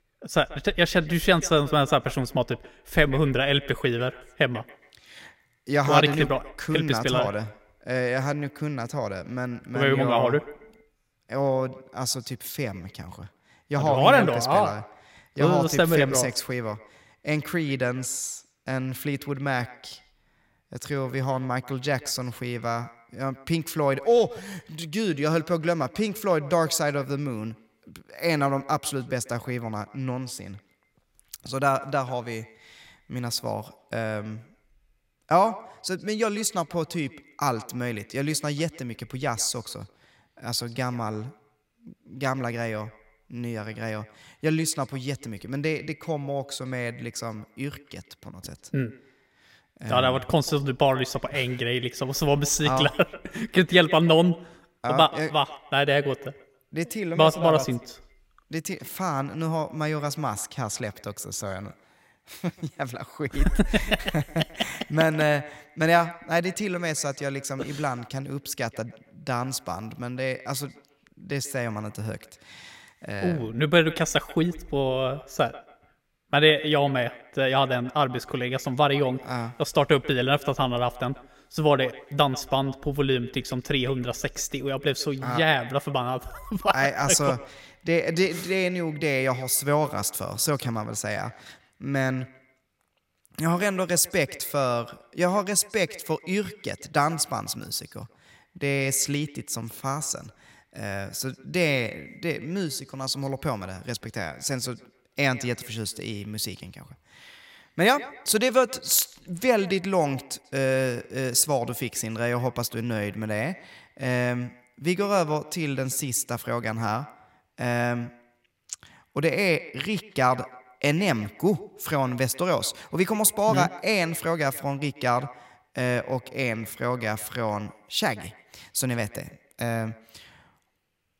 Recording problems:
echo of what is said; faint; throughout; 140 ms later, 20 dB below the speech

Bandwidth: 16 kHz